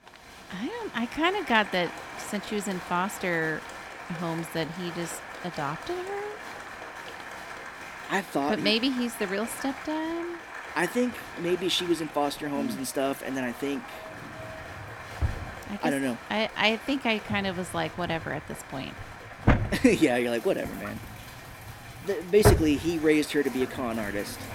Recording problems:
household noises; loud; throughout; 4 dB below the speech
crowd noise; noticeable; throughout; 10 dB below the speech

